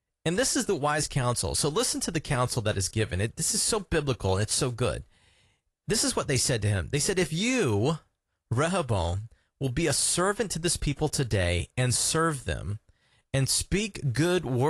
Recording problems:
garbled, watery; slightly; nothing above 11 kHz
abrupt cut into speech; at the end

